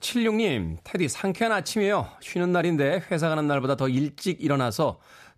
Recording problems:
none

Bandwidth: 14.5 kHz